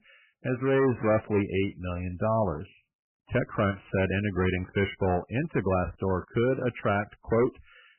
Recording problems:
garbled, watery; badly; nothing above 3 kHz
distortion; slight; 6% of the sound clipped

